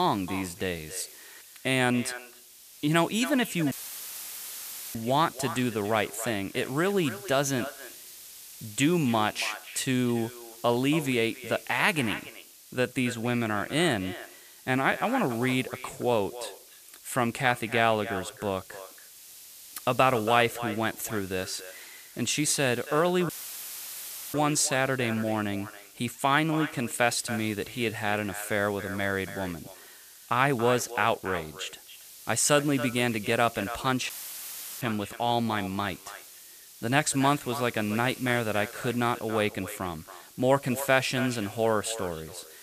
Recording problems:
echo of what is said; noticeable; throughout; 280 ms later, 15 dB below the speech
hiss; noticeable; throughout; 20 dB below the speech
abrupt cut into speech; at the start
audio cutting out; filled with static; at 3.5 s for 1 s, at 23 s for 1 s and at 34 s for 0.5 s

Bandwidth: 14.5 kHz